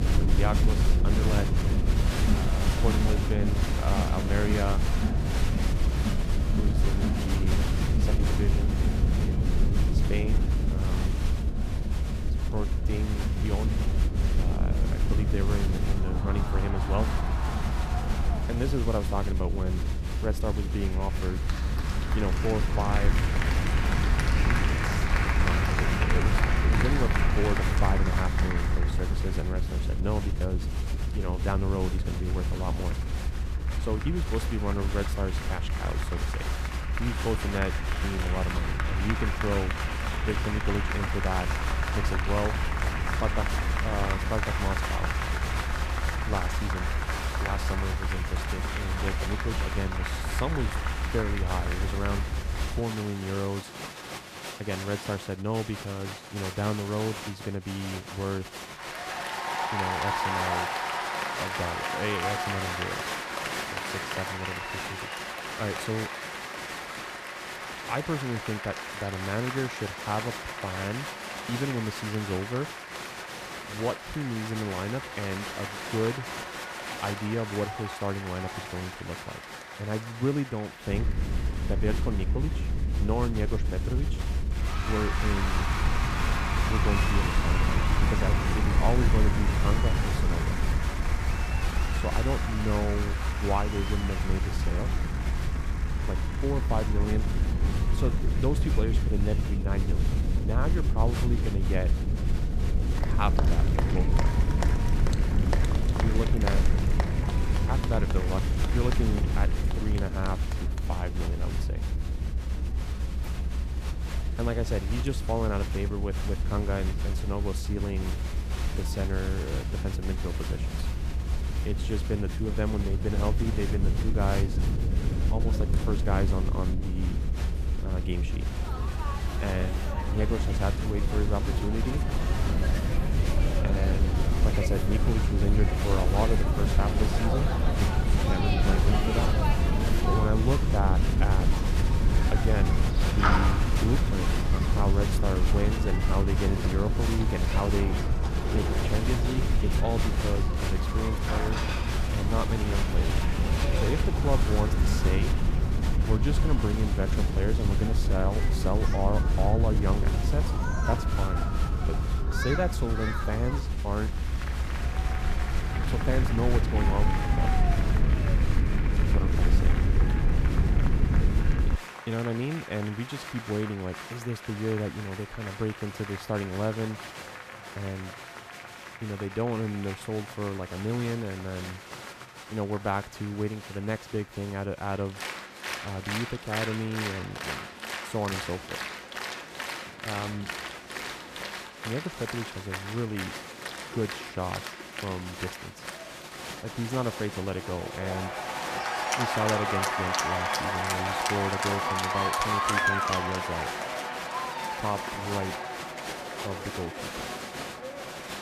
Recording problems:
crowd noise; loud; throughout; 2 dB below the speech
low rumble; loud; until 53 s and from 1:21 to 2:52; 6 dB below the speech

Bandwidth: 14.5 kHz